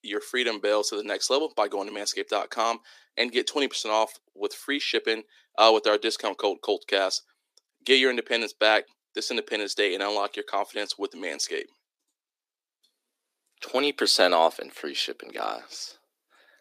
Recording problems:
thin; somewhat; fading below 300 Hz

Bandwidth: 15 kHz